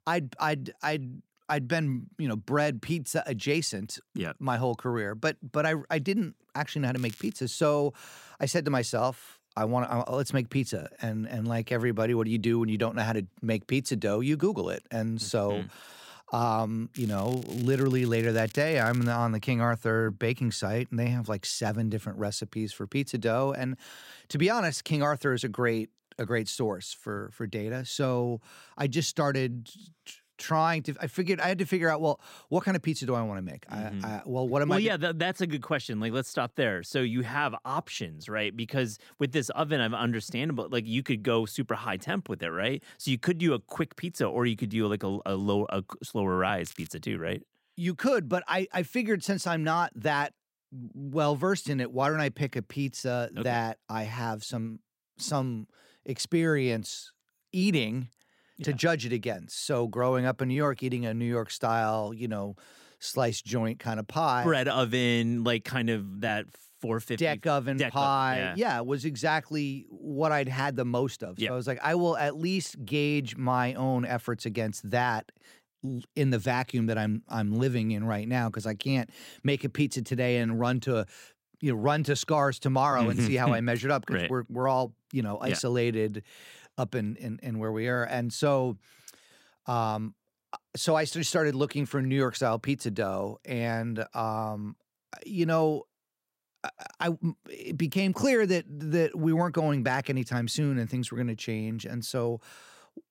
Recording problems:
crackling; noticeable; at 7 s, from 17 to 19 s and at 47 s; 20 dB below the speech

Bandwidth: 16 kHz